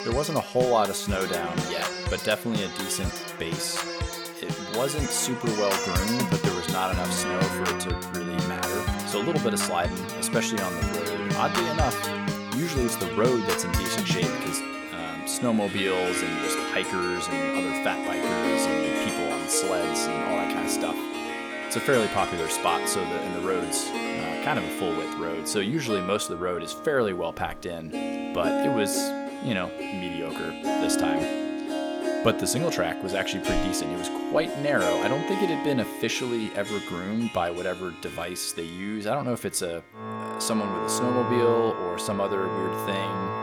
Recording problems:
background music; loud; throughout; 1 dB below the speech

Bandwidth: 18 kHz